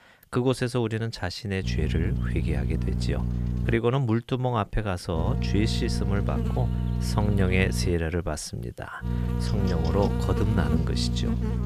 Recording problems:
electrical hum; loud; from 1.5 to 4 s, from 5 to 8 s and from 9 s on; 60 Hz, 6 dB below the speech

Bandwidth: 14.5 kHz